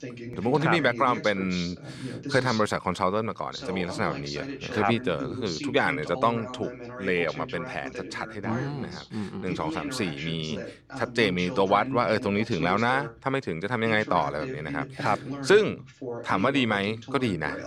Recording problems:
voice in the background; loud; throughout; 10 dB below the speech

